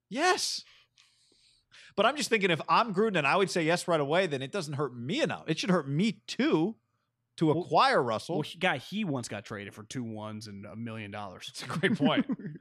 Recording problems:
none

